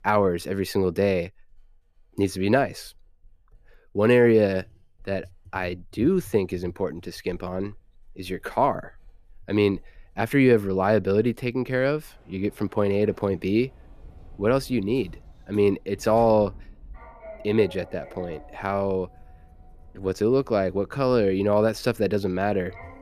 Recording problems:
household noises; faint; throughout; 25 dB below the speech

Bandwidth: 14.5 kHz